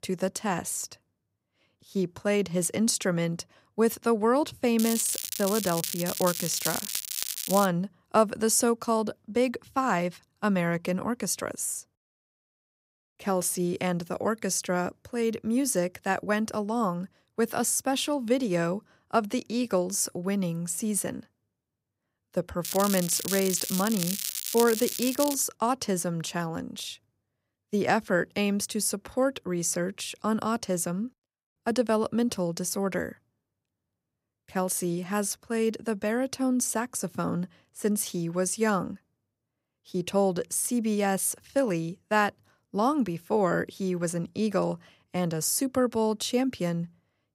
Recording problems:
crackling; loud; from 5 to 7.5 s and from 23 to 25 s; 3 dB below the speech

